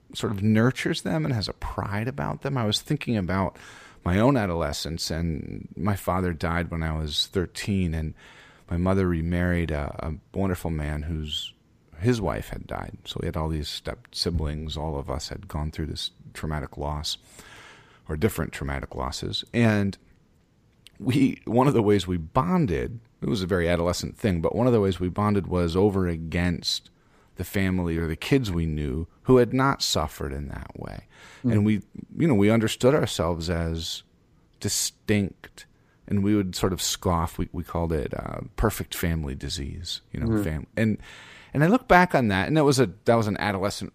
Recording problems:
none

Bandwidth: 15 kHz